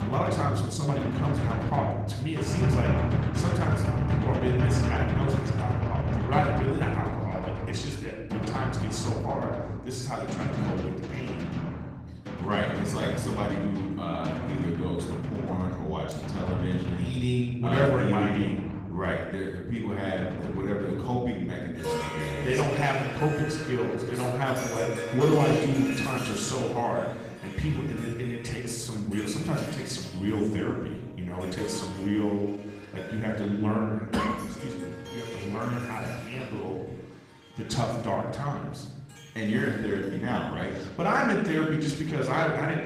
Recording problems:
room echo; noticeable; dies away in 1.1 s
off-mic speech; somewhat distant
garbled, watery; slightly
background music; loud; throughout; 2 dB below the speech

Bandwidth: 15 kHz